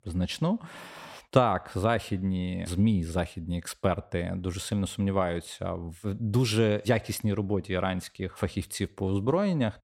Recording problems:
none

